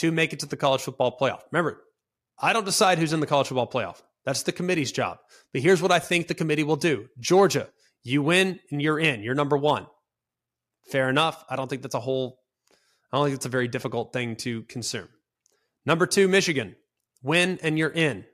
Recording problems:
abrupt cut into speech; at the start

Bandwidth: 14.5 kHz